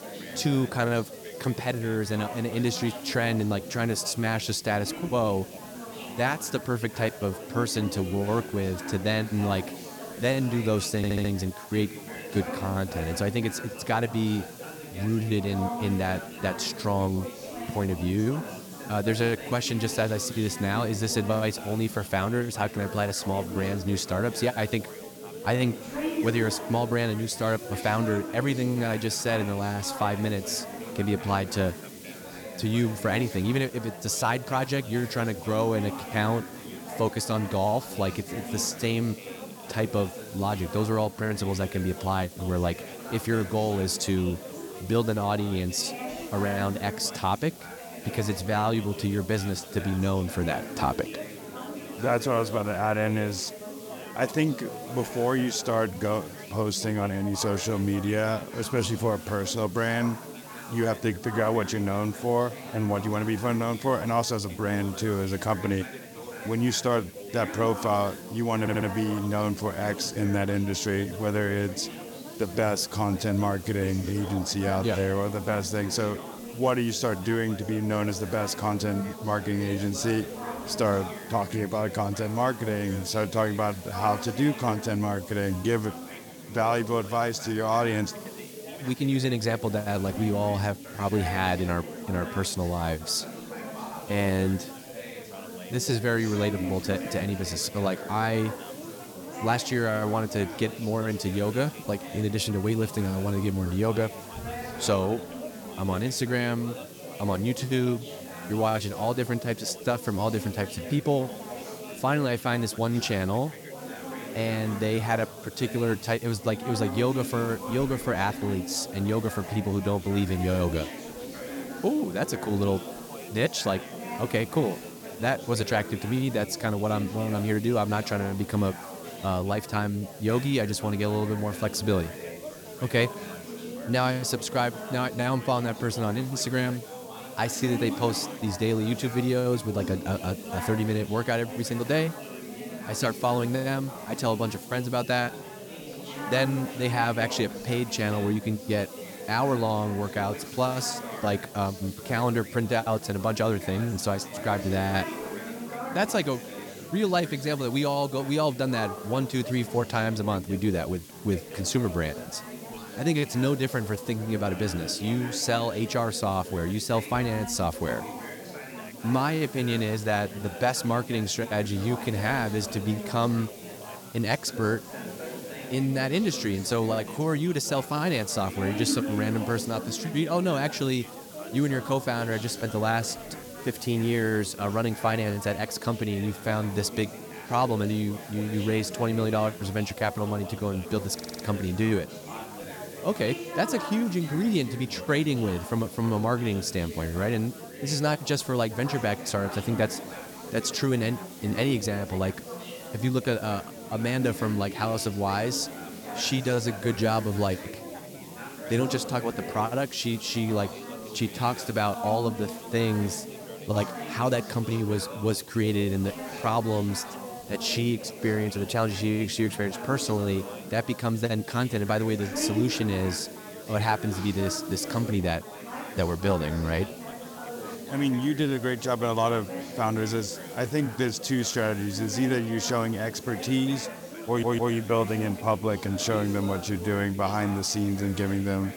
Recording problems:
chatter from many people; noticeable; throughout; 10 dB below the speech
hiss; noticeable; throughout; 20 dB below the speech
audio stuttering; 4 times, first at 11 s

